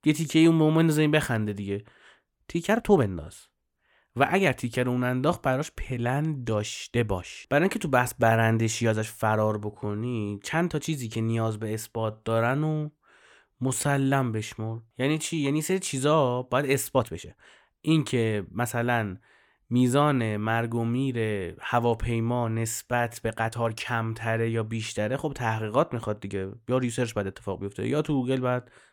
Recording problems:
uneven, jittery; strongly; from 2.5 to 28 s

